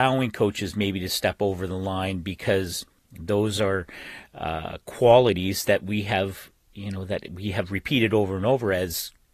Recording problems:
garbled, watery; slightly; nothing above 14.5 kHz
abrupt cut into speech; at the start

